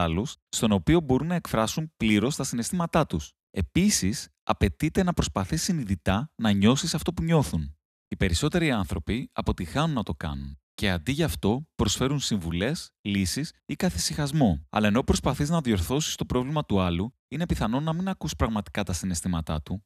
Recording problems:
abrupt cut into speech; at the start

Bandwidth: 14 kHz